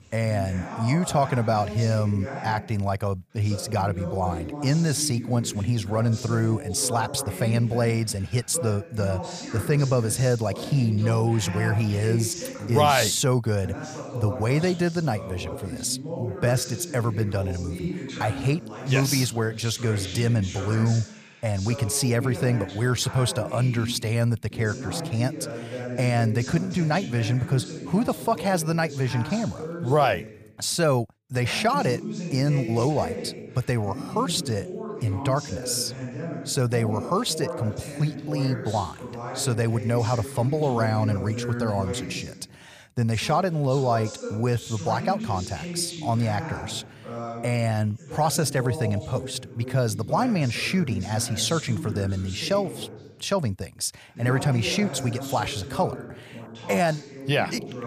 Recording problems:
voice in the background; loud; throughout; 9 dB below the speech

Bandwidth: 15 kHz